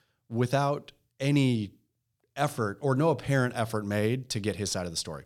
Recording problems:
none

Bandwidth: 18 kHz